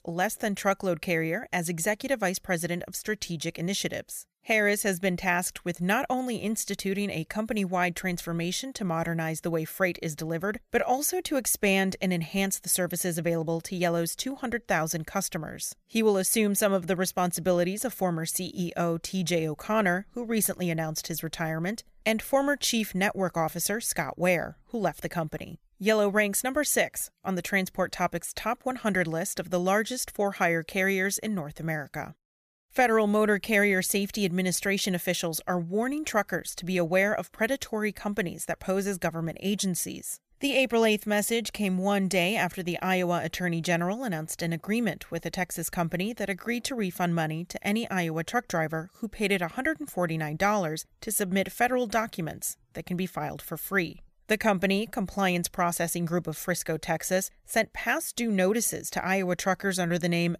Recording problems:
none

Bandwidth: 14.5 kHz